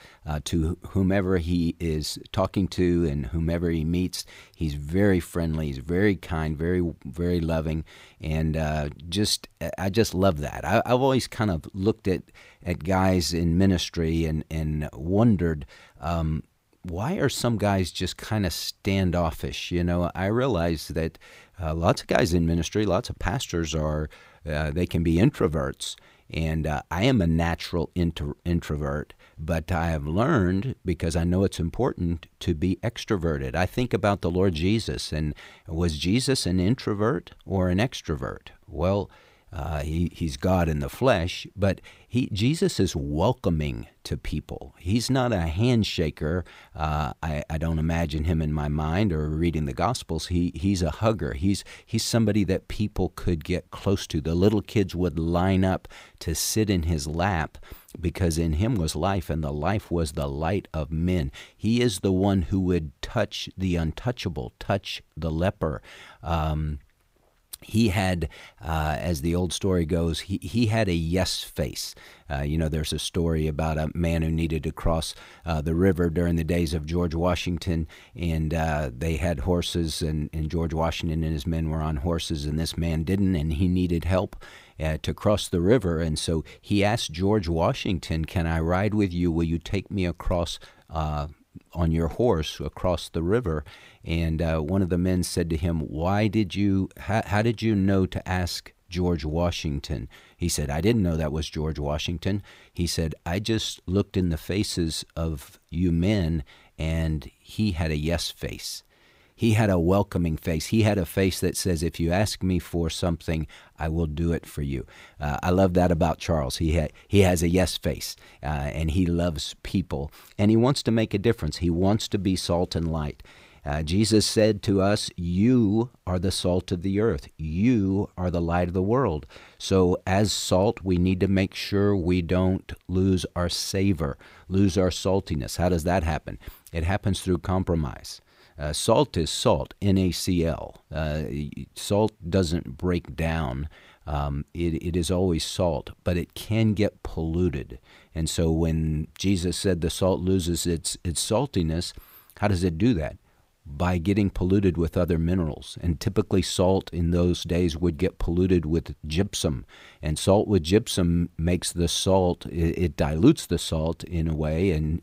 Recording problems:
none

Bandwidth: 15.5 kHz